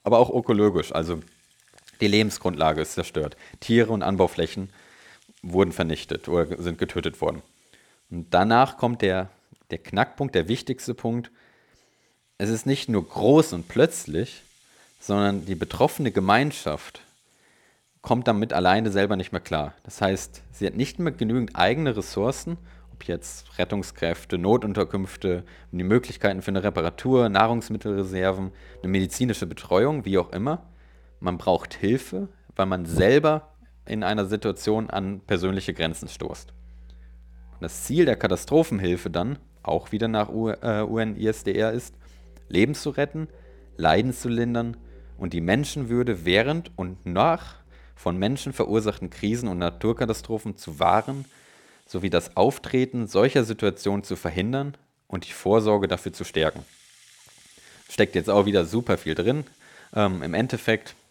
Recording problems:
background music; faint; throughout; 30 dB below the speech

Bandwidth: 18 kHz